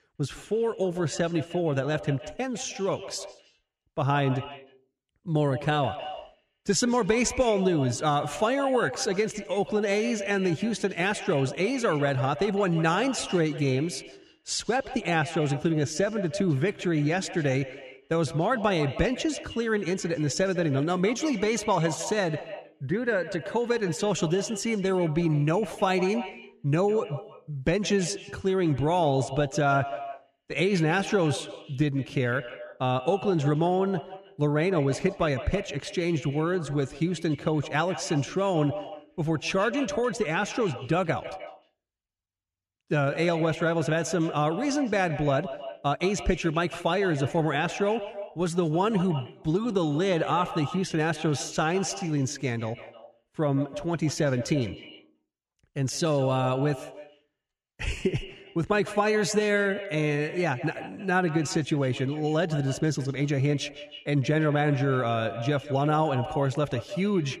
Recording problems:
echo of what is said; noticeable; throughout; 150 ms later, 15 dB below the speech

